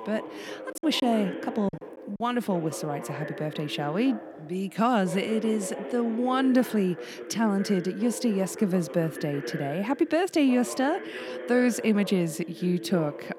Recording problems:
voice in the background; noticeable; throughout; 10 dB below the speech
choppy; very; from 0.5 to 2 s; 14% of the speech affected

